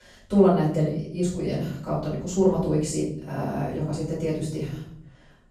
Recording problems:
off-mic speech; far
room echo; noticeable; dies away in 0.6 s

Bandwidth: 14.5 kHz